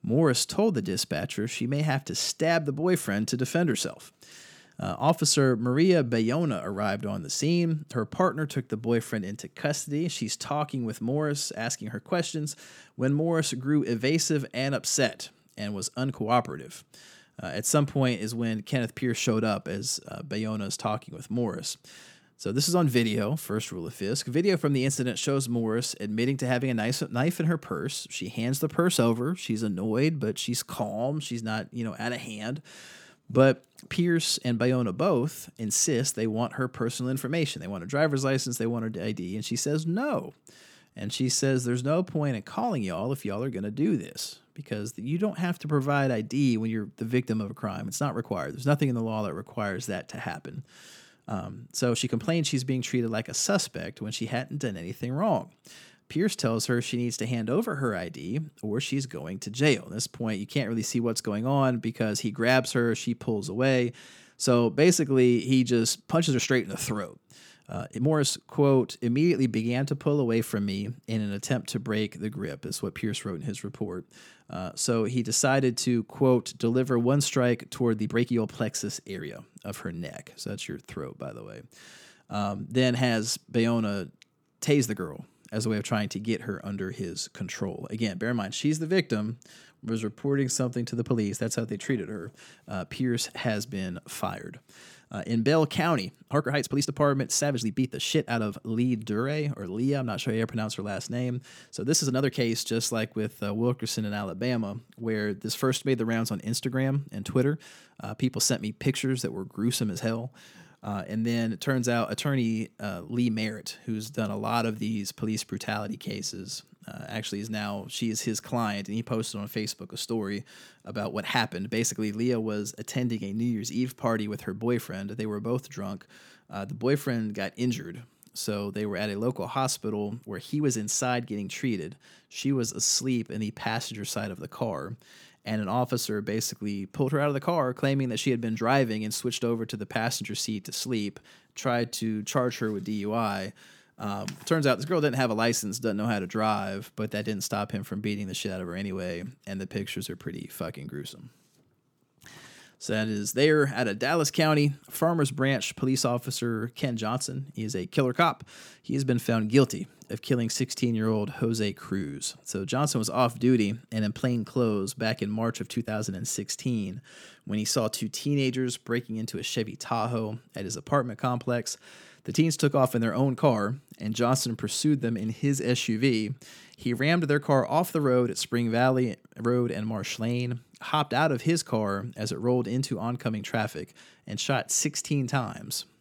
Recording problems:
uneven, jittery; strongly; from 16 s to 2:46

